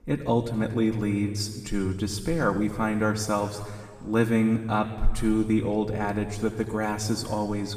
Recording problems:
room echo; noticeable; dies away in 1.6 s
off-mic speech; somewhat distant

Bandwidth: 15 kHz